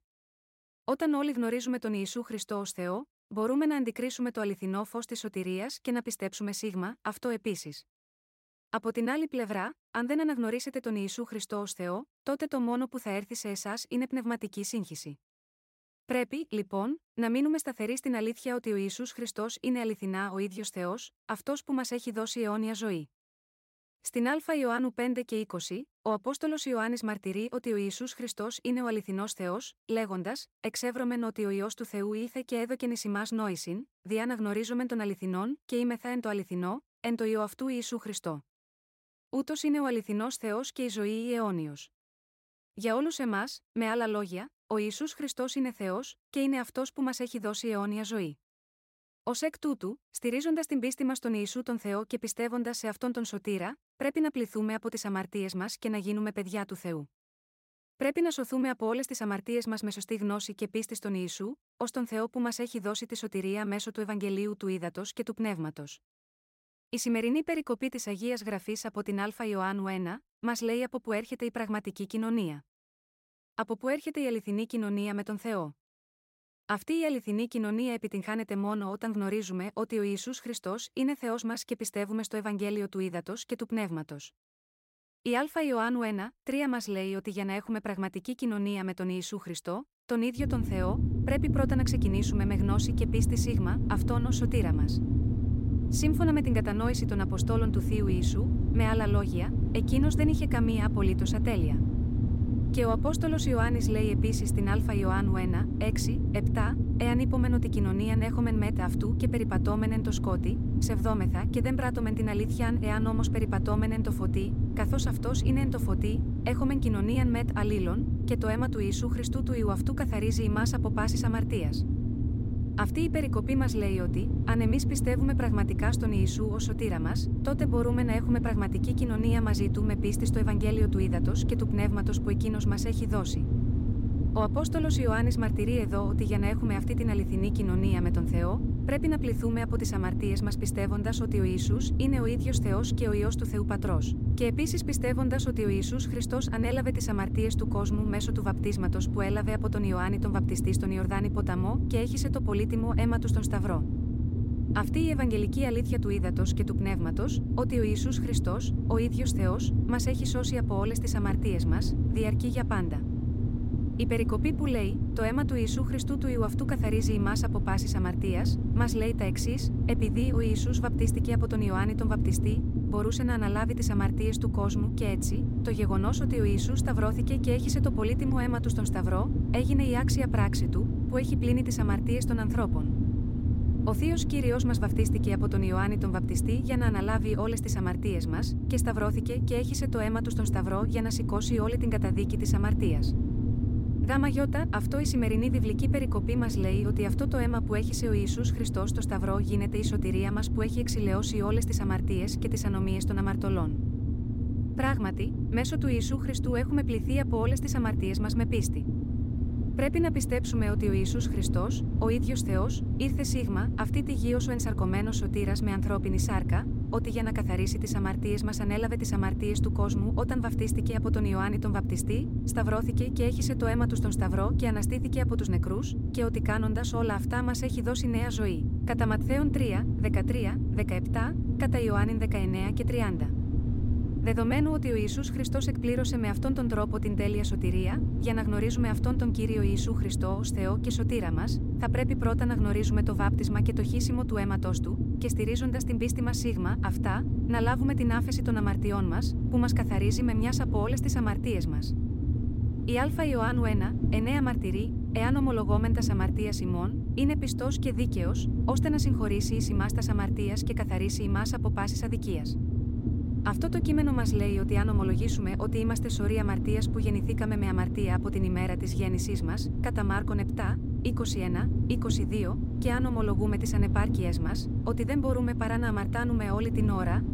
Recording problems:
low rumble; loud; from 1:30 on; 5 dB below the speech

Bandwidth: 16 kHz